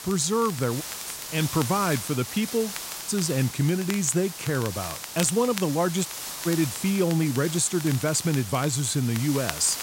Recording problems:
hiss; loud; throughout; 9 dB below the speech
crackle, like an old record; noticeable; 15 dB below the speech
audio cutting out; at 1 s, at 3 s and at 6 s

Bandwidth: 16 kHz